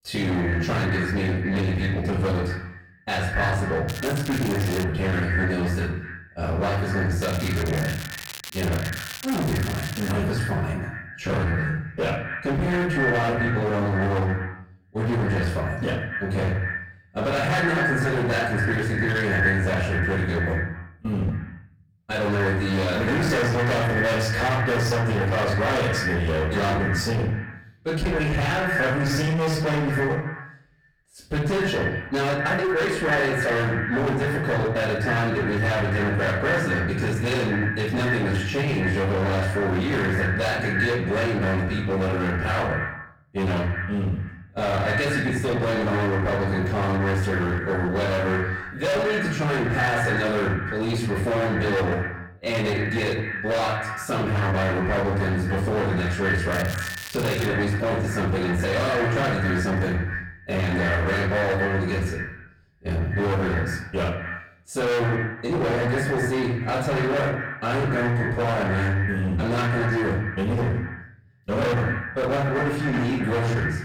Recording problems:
distortion; heavy; 32% of the sound clipped
echo of what is said; strong; throughout; 120 ms later, 6 dB below the speech
off-mic speech; far
room echo; noticeable; dies away in 0.5 s
crackling; noticeable; at 4 s, from 7 to 10 s and at 57 s; 10 dB below the speech
uneven, jittery; strongly; from 11 to 53 s

